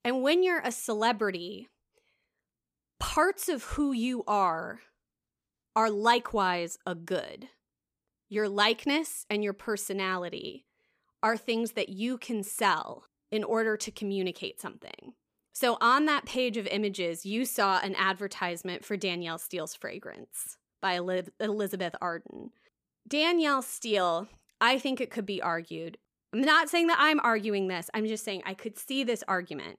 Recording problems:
none

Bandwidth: 15 kHz